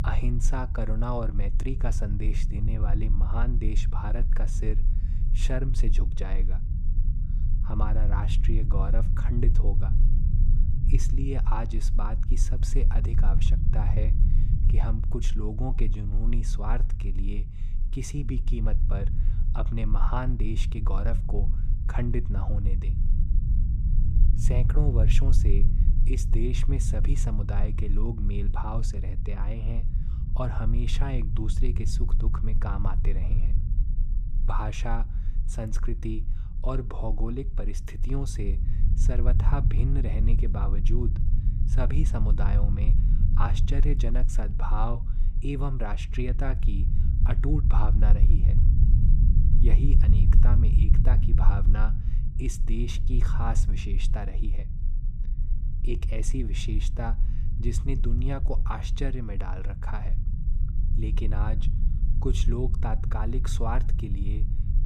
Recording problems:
low rumble; loud; throughout; 7 dB below the speech

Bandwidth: 15 kHz